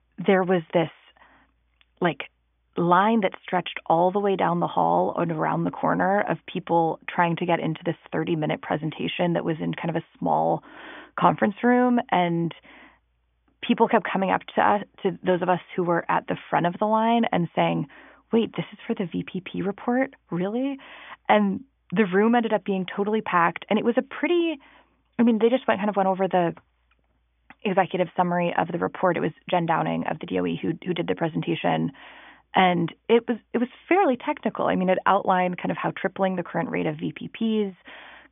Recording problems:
high frequencies cut off; severe; nothing above 3.5 kHz

